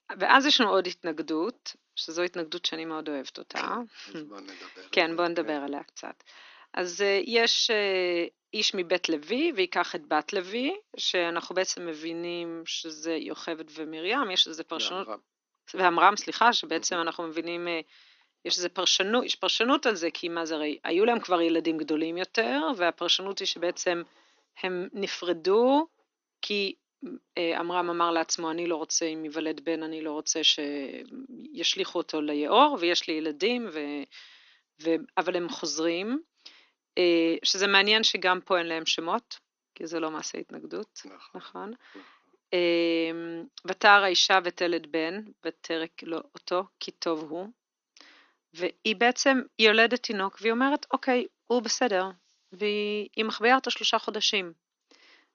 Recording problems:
thin; somewhat; fading below 300 Hz
garbled, watery; slightly; nothing above 6.5 kHz

